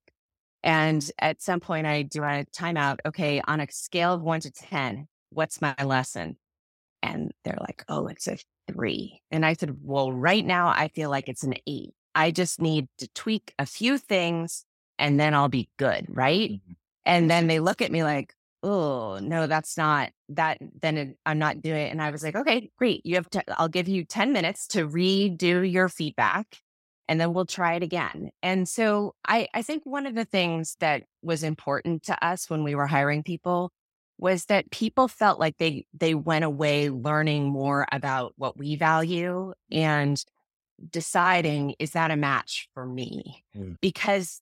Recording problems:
none

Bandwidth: 16 kHz